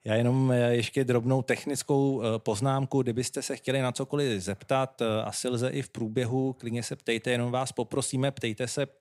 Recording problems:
none

